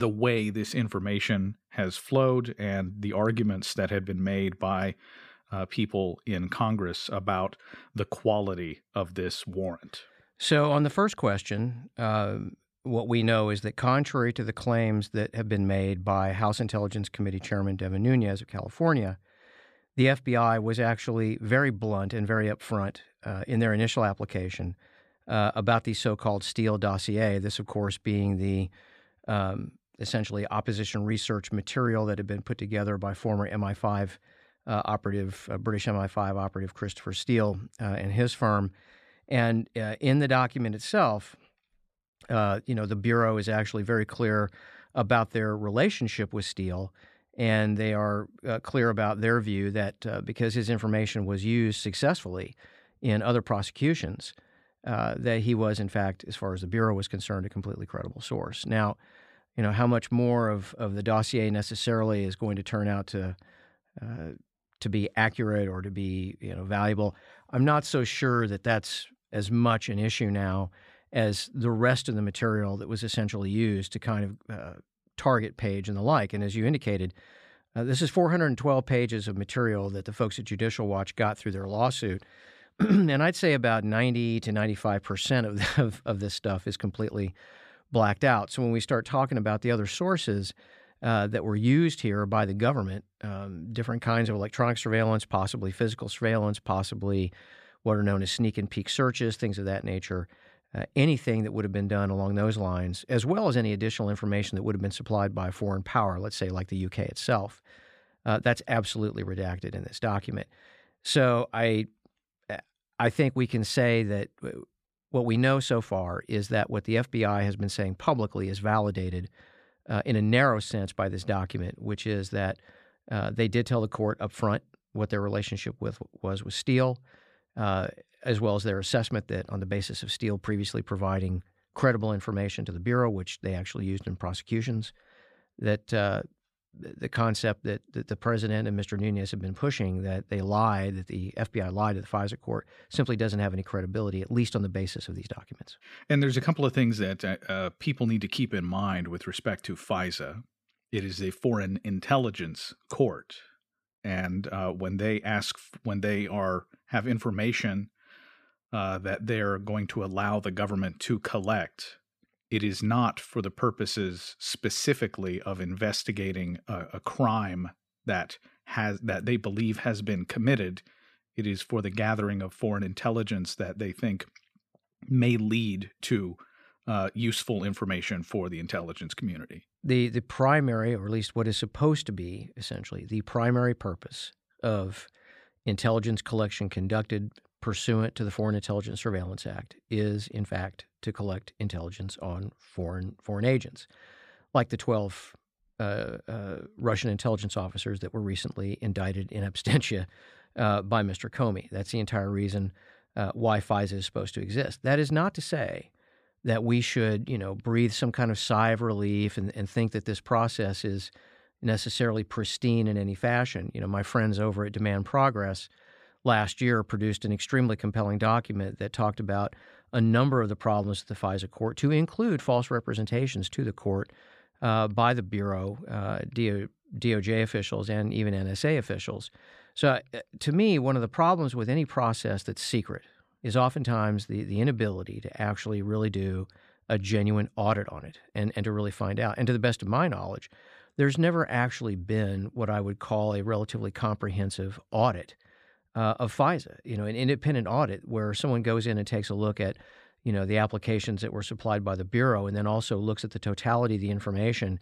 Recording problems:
abrupt cut into speech; at the start

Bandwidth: 14.5 kHz